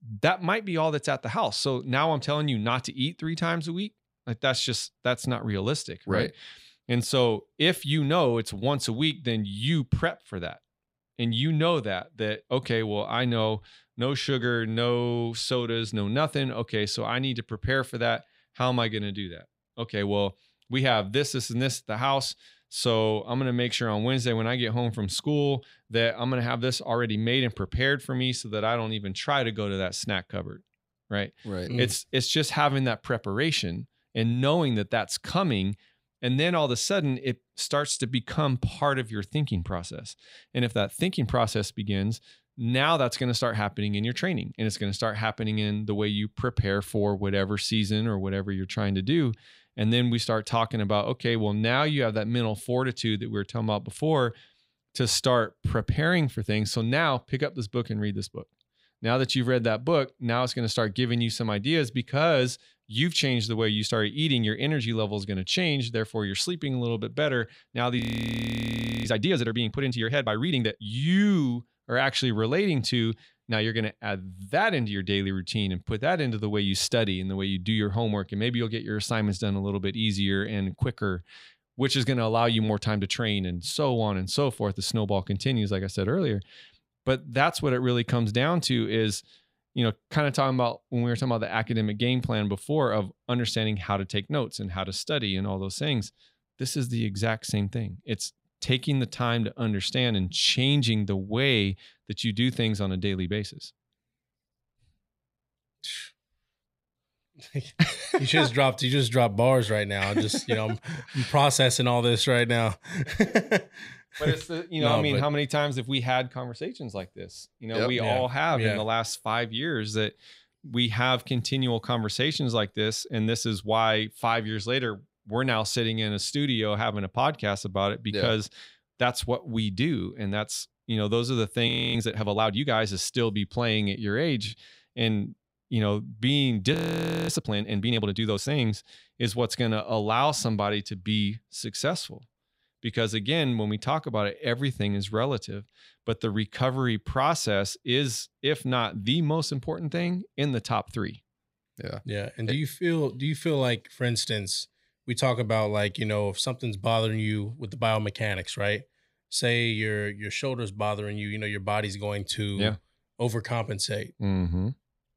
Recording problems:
audio freezing; at 1:08 for 1 s, at 2:12 and at 2:17 for 0.5 s

